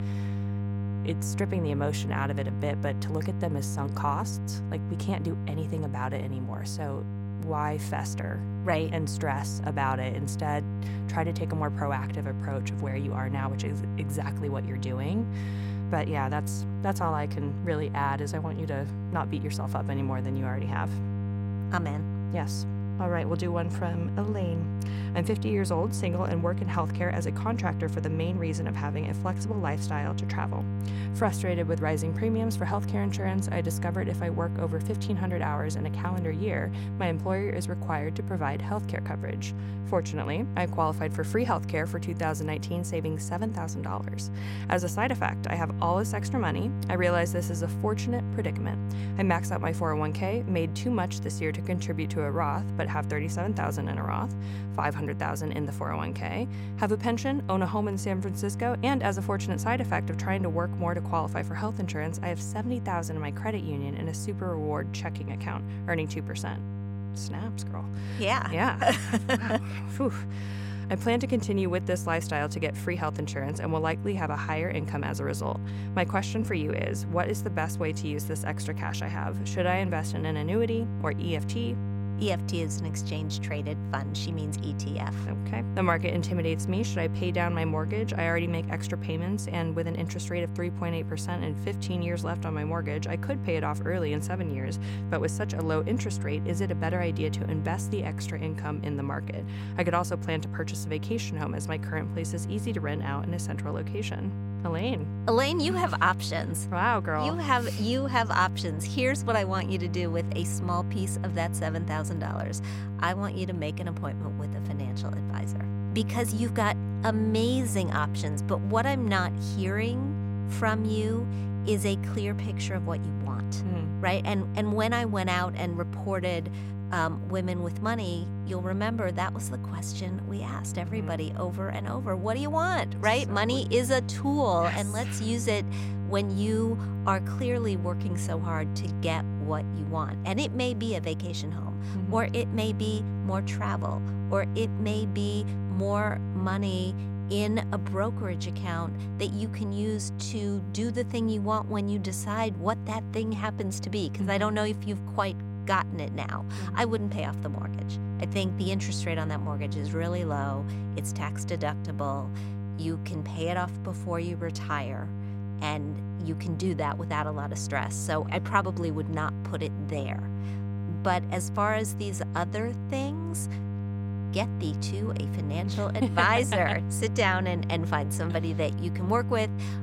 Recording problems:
electrical hum; noticeable; throughout; 50 Hz, 10 dB below the speech

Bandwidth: 16.5 kHz